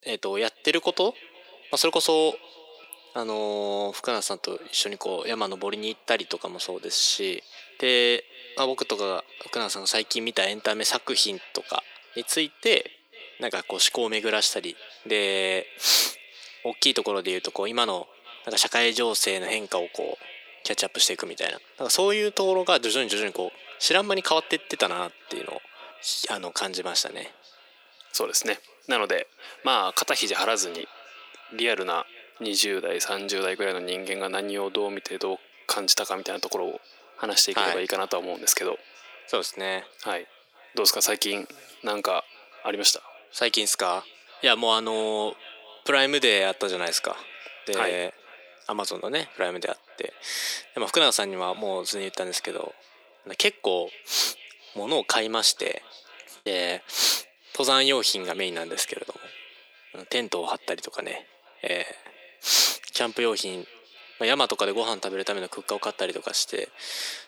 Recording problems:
thin; very; fading below 300 Hz
echo of what is said; faint; throughout; 470 ms later, 20 dB below the speech
choppy; occasionally; at 56 s; 2% of the speech affected

